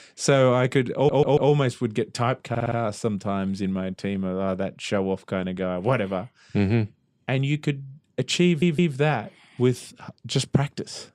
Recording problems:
audio stuttering; at 1 s, at 2.5 s and at 8.5 s

